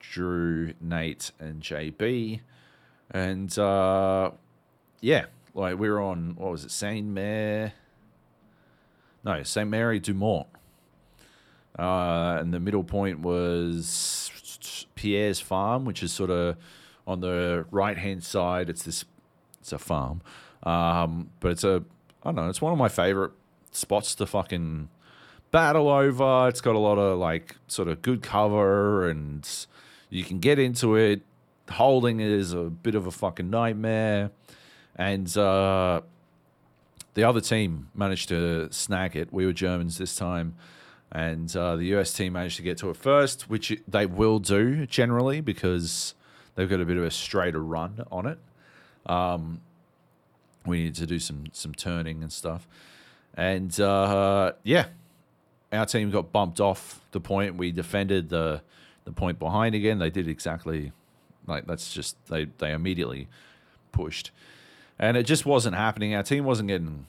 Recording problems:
none

